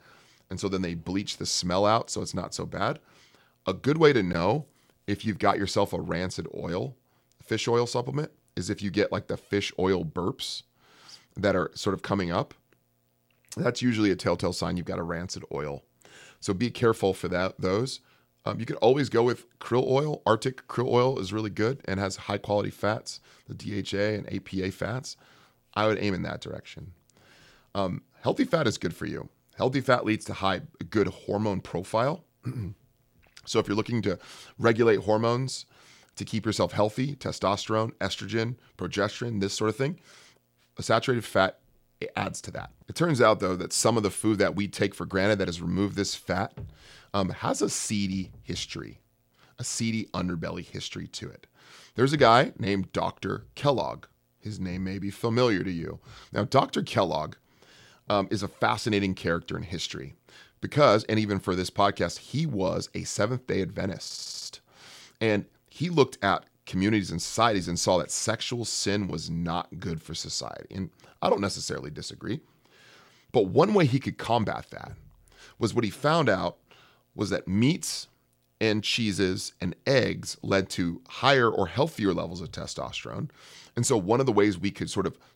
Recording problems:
audio stuttering; at 1:04

